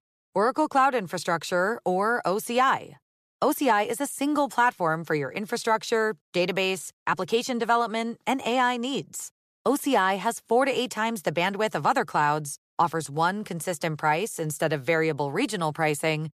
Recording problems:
none

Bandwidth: 14.5 kHz